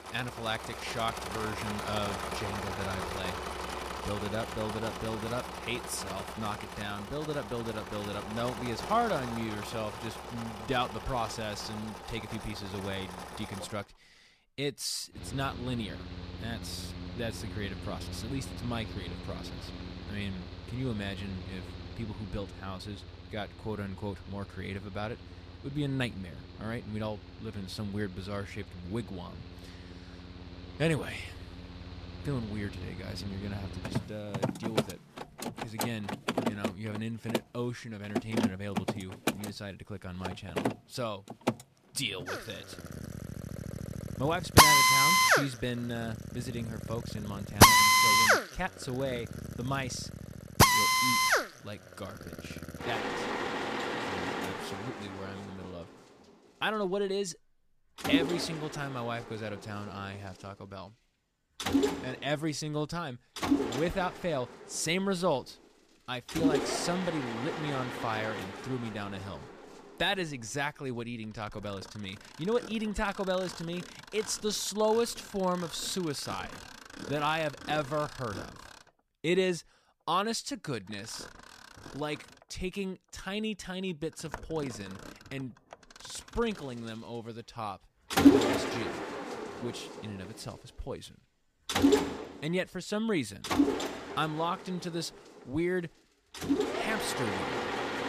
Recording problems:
machinery noise; very loud; throughout; 5 dB above the speech

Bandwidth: 14.5 kHz